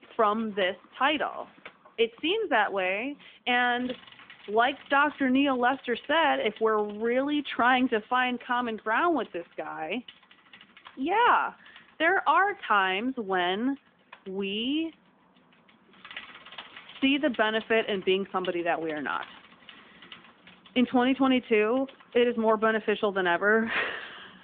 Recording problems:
phone-call audio; nothing above 3.5 kHz
traffic noise; faint; throughout; 25 dB below the speech

